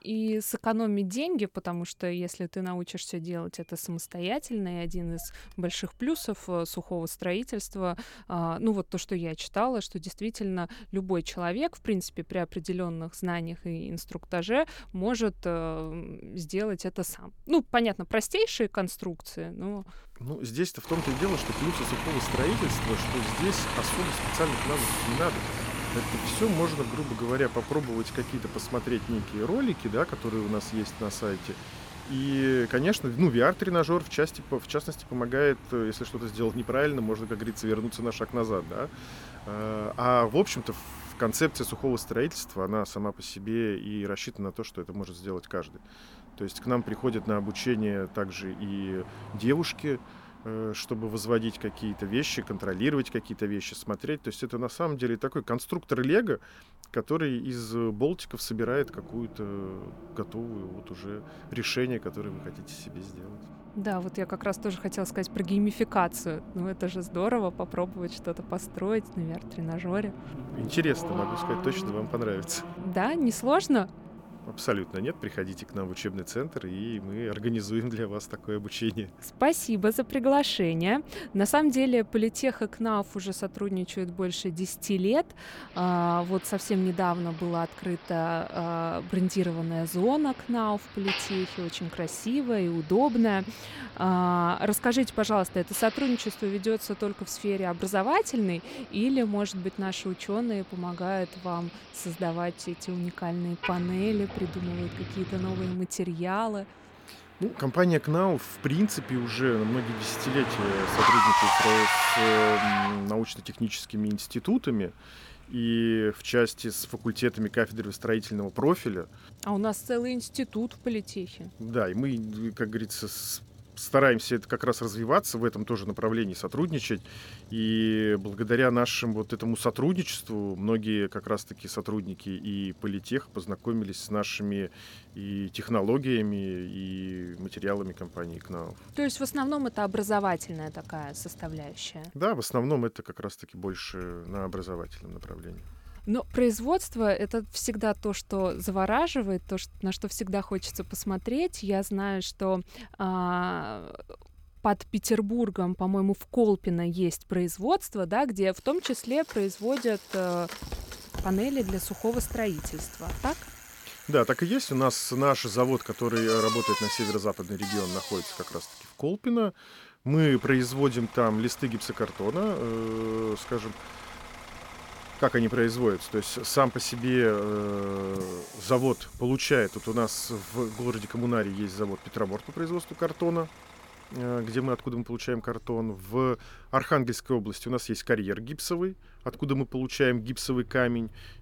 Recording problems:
traffic noise; loud; throughout; 6 dB below the speech
footsteps; noticeable; from 2:41 to 2:44; peak 9 dB below the speech

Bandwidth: 17 kHz